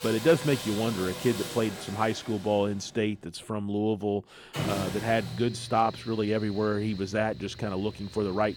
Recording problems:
machinery noise; loud; throughout; 10 dB below the speech

